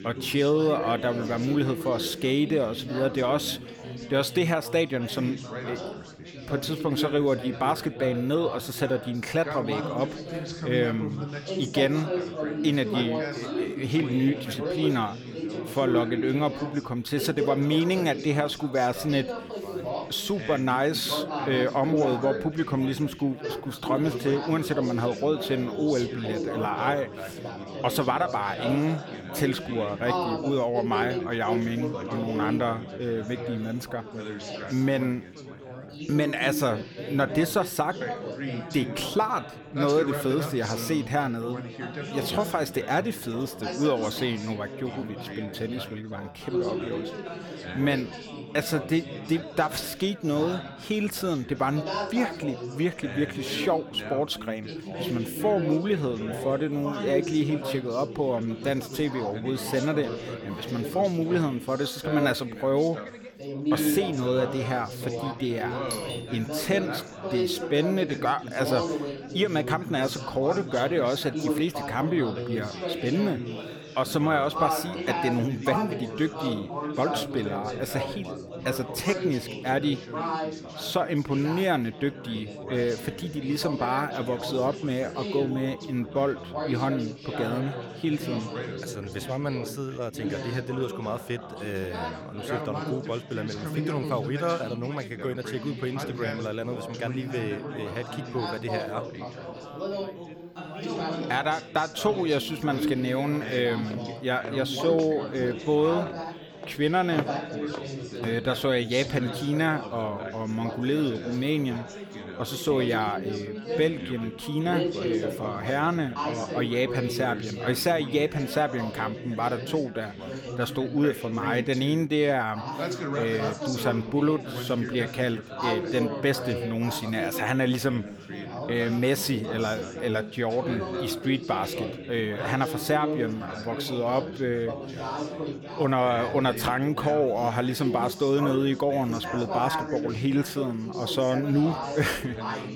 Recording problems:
background chatter; loud; throughout; 4 voices, 6 dB below the speech
doorbell; noticeable; at 1:06; peak 7 dB below the speech
footsteps; noticeable; from 1:43 to 1:48; peak 7 dB below the speech

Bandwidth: 18 kHz